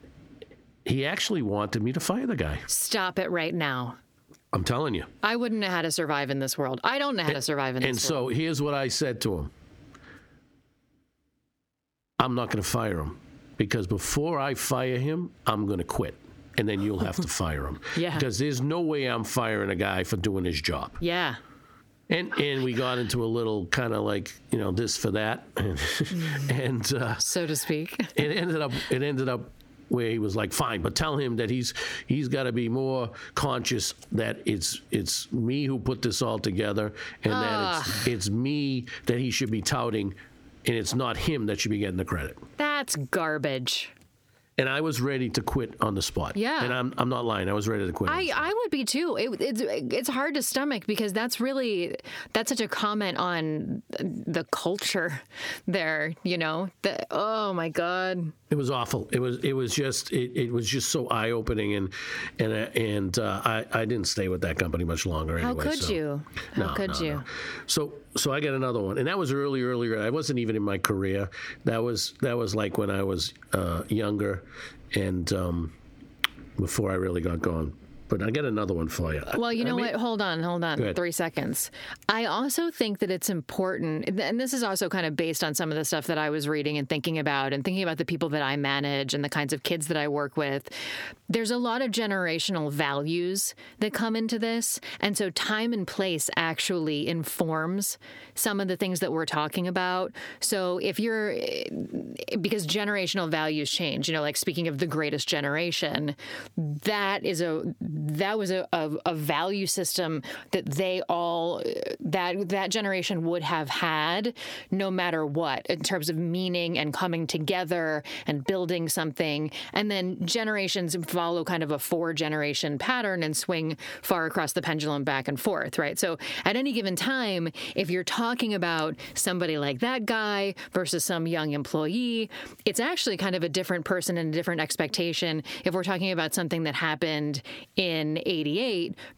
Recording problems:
squashed, flat; heavily

